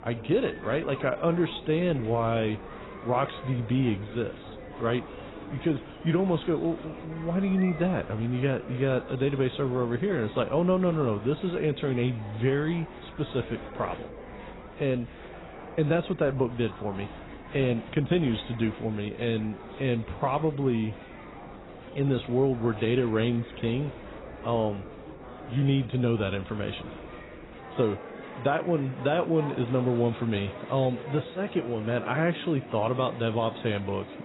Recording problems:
garbled, watery; badly; nothing above 4 kHz
murmuring crowd; noticeable; throughout; 15 dB below the speech

